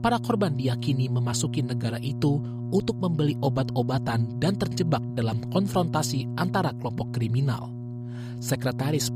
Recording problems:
electrical hum; noticeable; throughout; 60 Hz, 10 dB below the speech

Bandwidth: 15 kHz